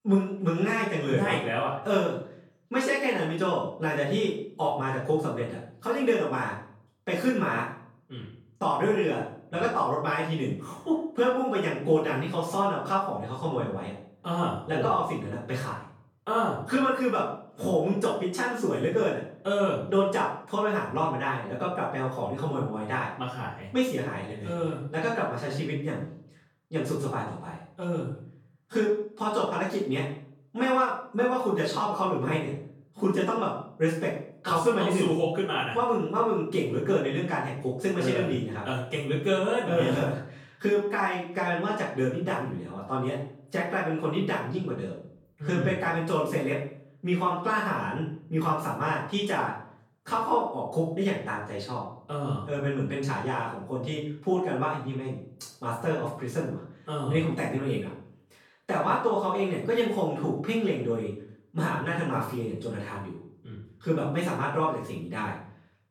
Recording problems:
off-mic speech; far
room echo; noticeable; dies away in 0.5 s

